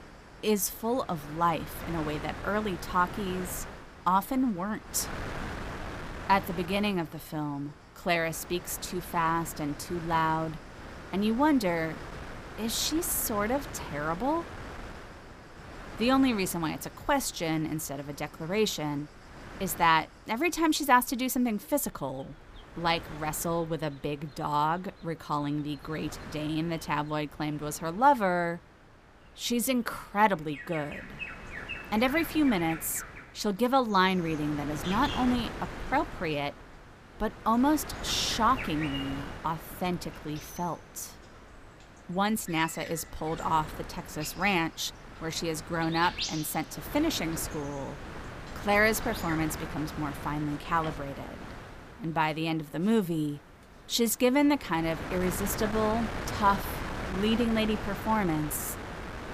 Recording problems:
animal sounds; noticeable; throughout; 15 dB below the speech
wind noise on the microphone; occasional gusts; 15 dB below the speech

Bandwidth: 15 kHz